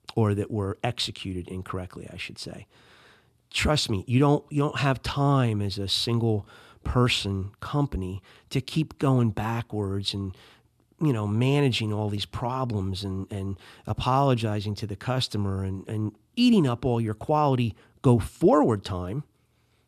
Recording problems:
none

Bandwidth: 13.5 kHz